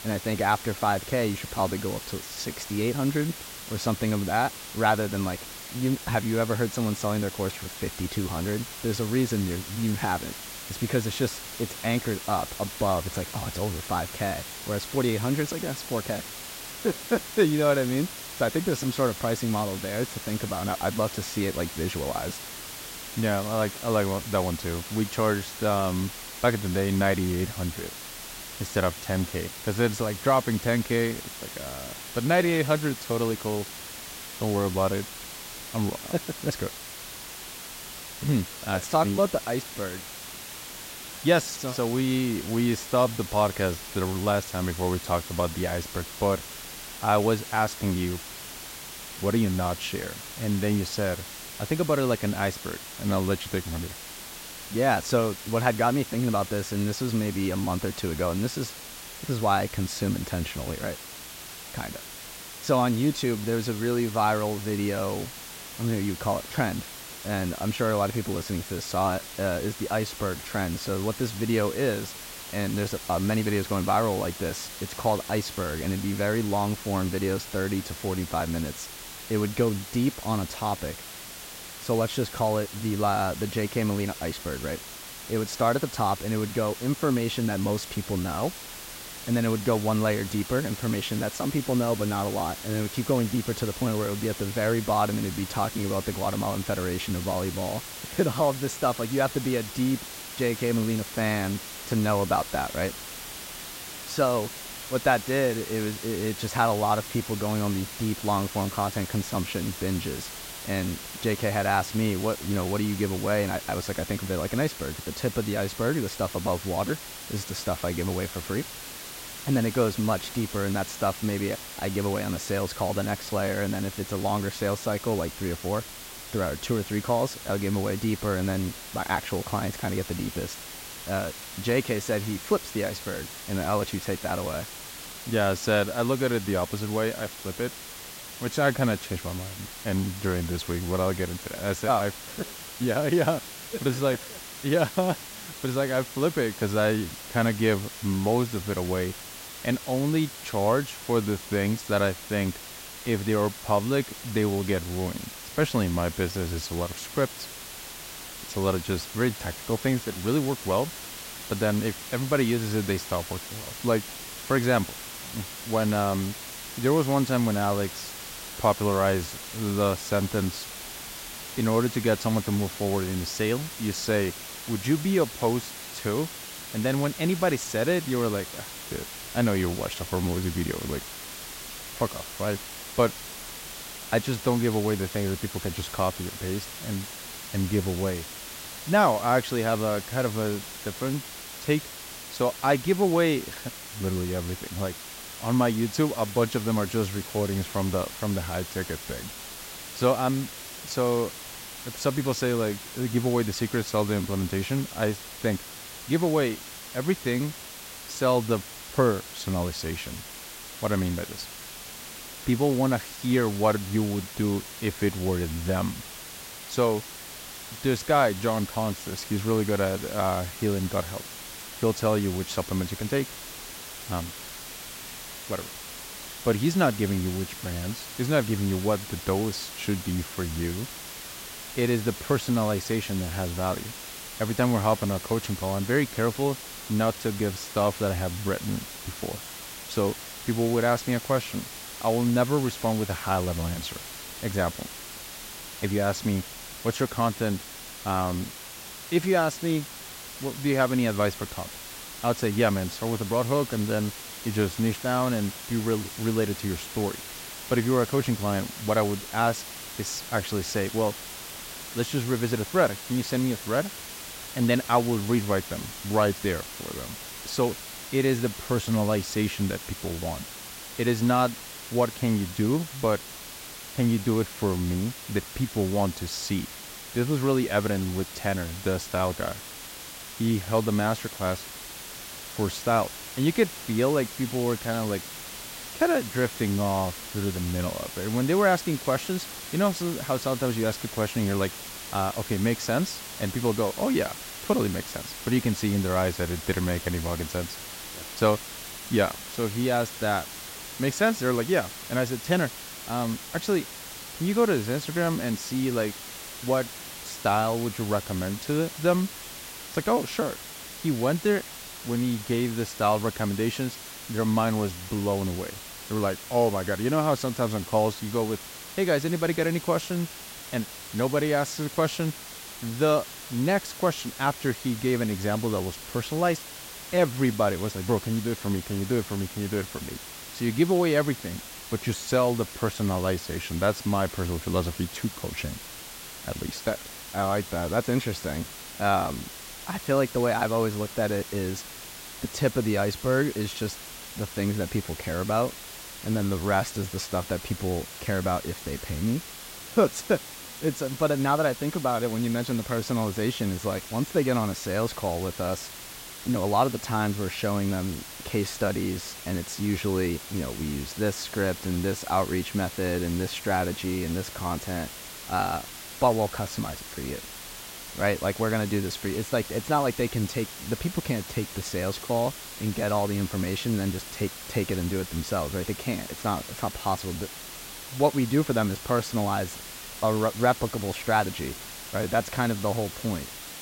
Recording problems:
hiss; loud; throughout; 10 dB below the speech

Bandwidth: 16 kHz